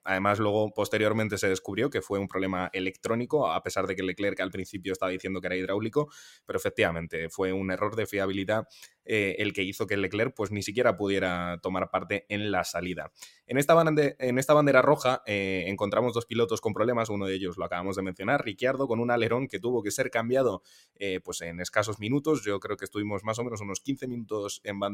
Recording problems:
abrupt cut into speech; at the end

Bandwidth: 16 kHz